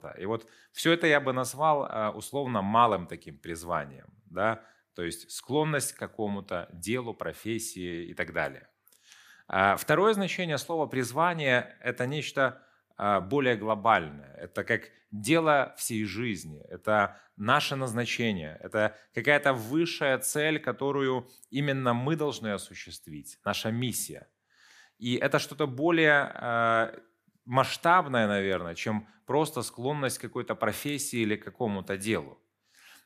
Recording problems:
none

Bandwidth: 15 kHz